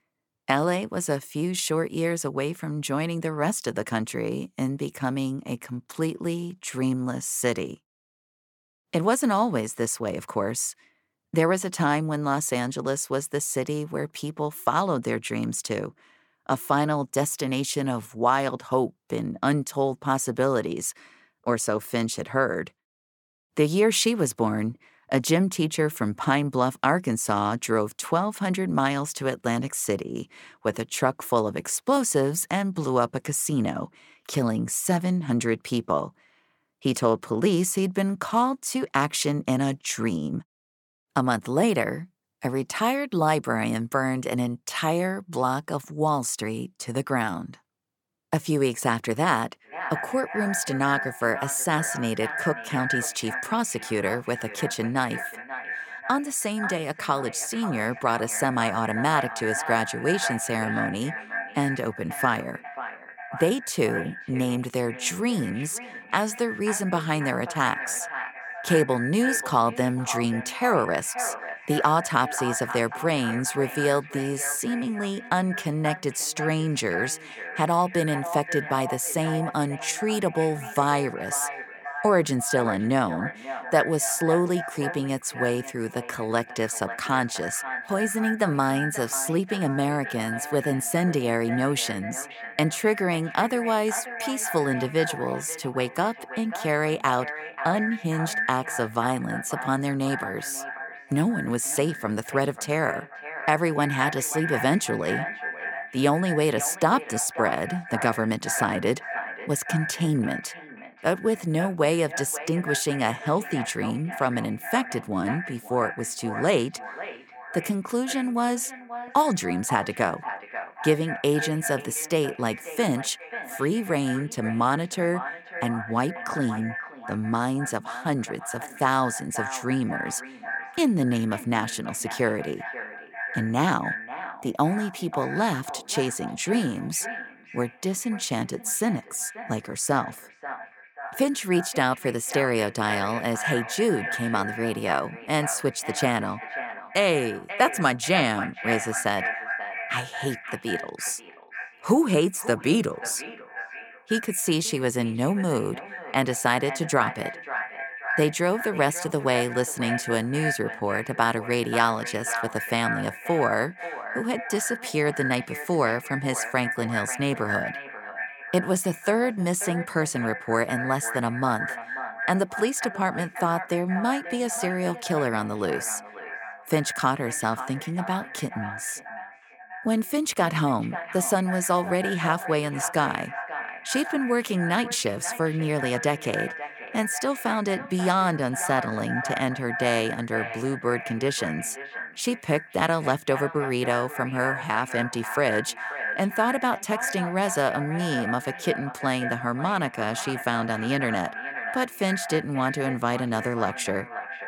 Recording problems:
echo of what is said; strong; from 50 s on; 540 ms later, 8 dB below the speech

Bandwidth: 18 kHz